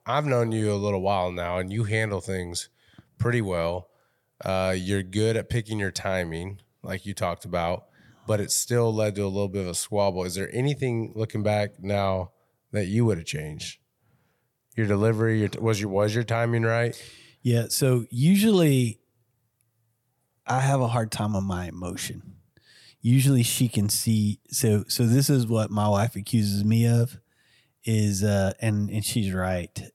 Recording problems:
none

